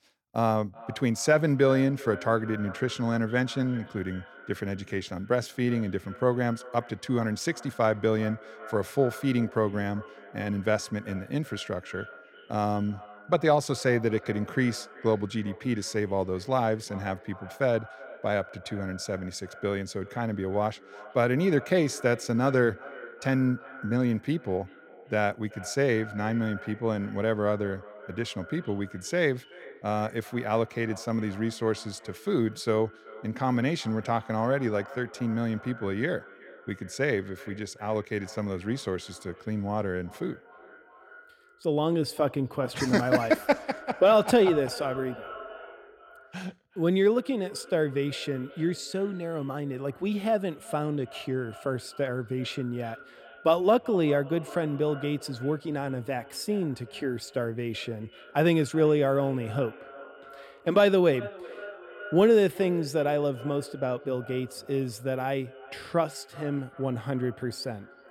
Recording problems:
echo of what is said; noticeable; throughout; 380 ms later, 20 dB below the speech

